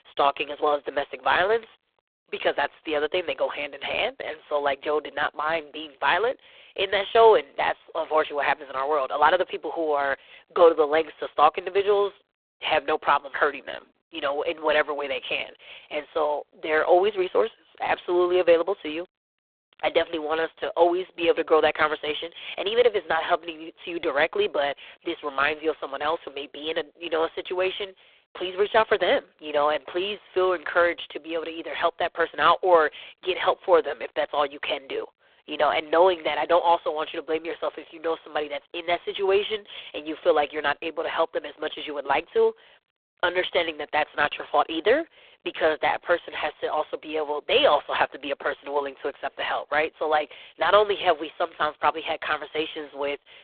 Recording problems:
phone-call audio; poor line

